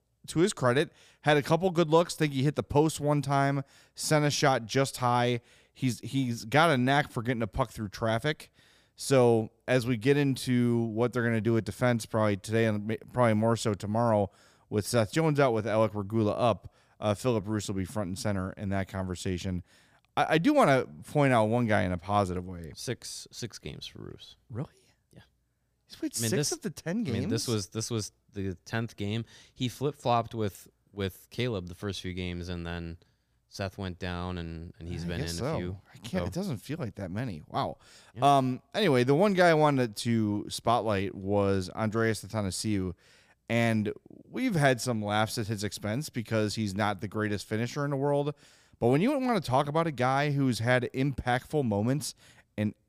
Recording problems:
none

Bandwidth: 15 kHz